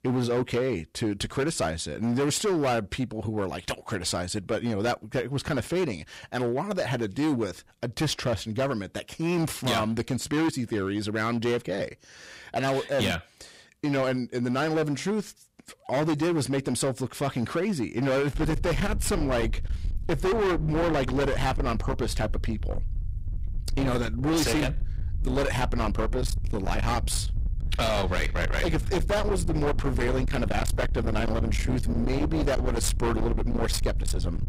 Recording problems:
distortion; heavy; 23% of the sound clipped
low rumble; loud; from 18 s on; 10 dB below the speech

